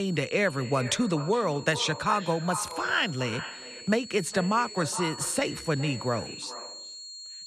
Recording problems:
echo of what is said; noticeable; throughout; 410 ms later, 15 dB below the speech
high-pitched whine; noticeable; throughout; 4.5 kHz, 15 dB below the speech
abrupt cut into speech; at the start

